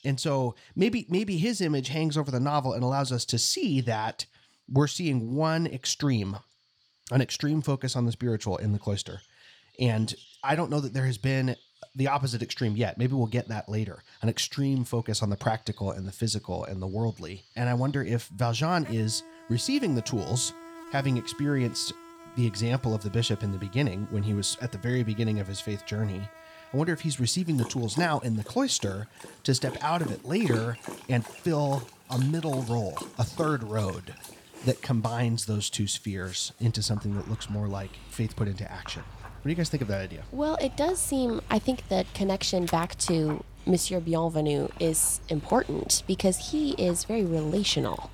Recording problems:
animal sounds; noticeable; throughout; 15 dB below the speech

